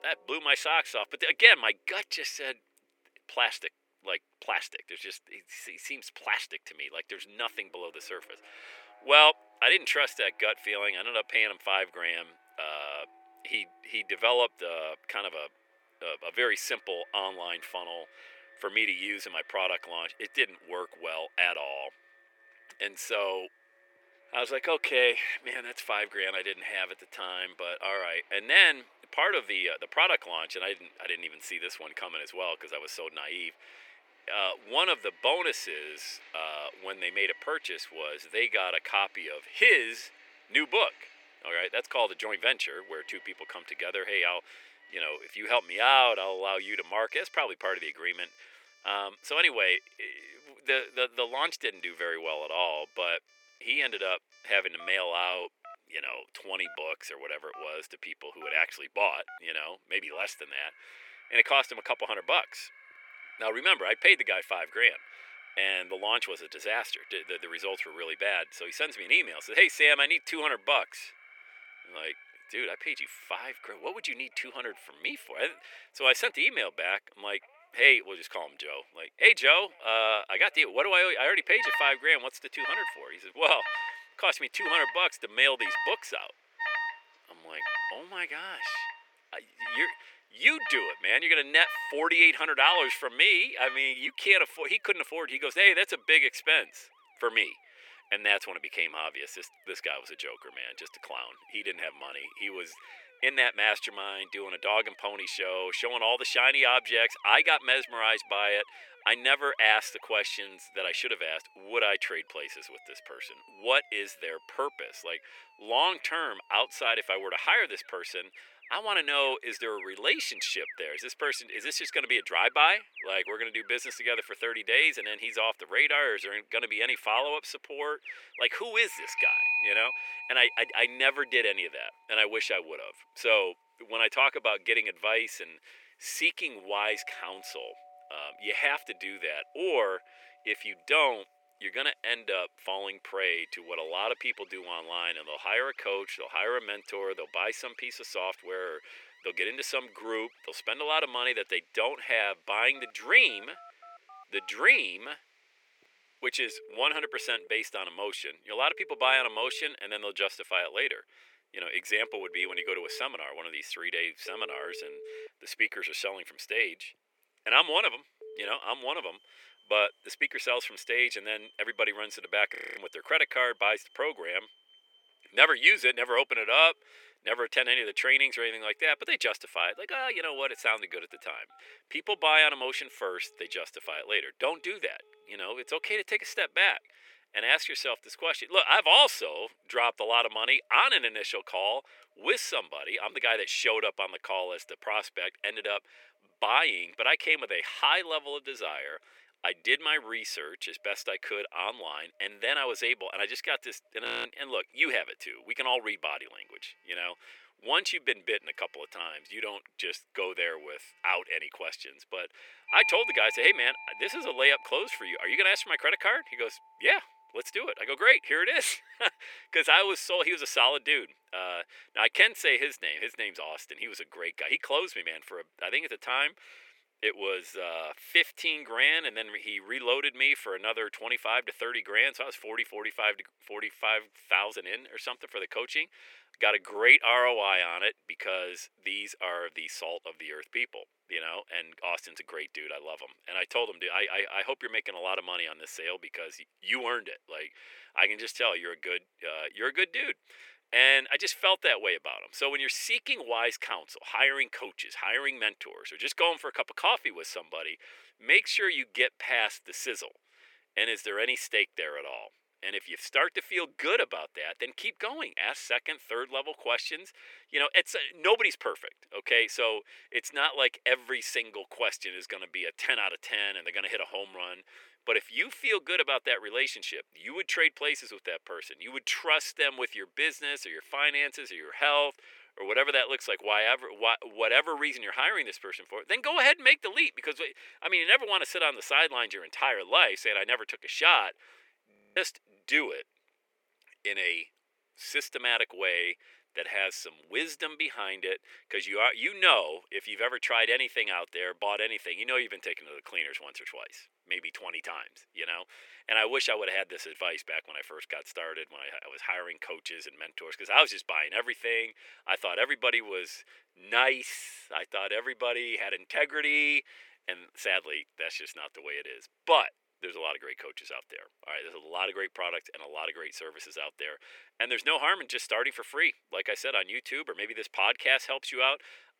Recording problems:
thin; very; fading below 350 Hz
alarms or sirens; noticeable; until 3:43; 10 dB below the speech
audio freezing; at 2:53, at 3:24 and at 4:52

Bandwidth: 17.5 kHz